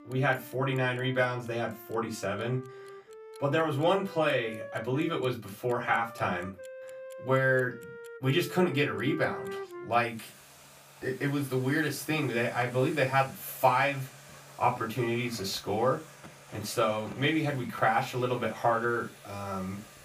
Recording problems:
off-mic speech; far
room echo; very slight; dies away in 0.2 s
background music; noticeable; throughout; 15 dB below the speech
household noises; faint; throughout; 20 dB below the speech

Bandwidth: 15 kHz